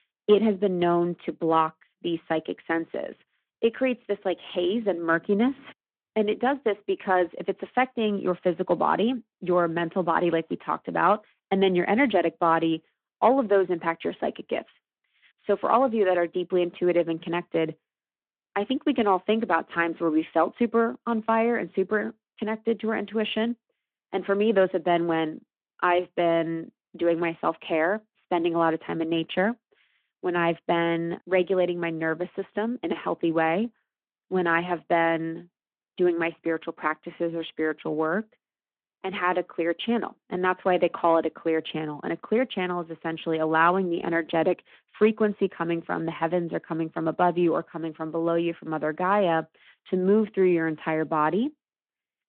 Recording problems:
phone-call audio

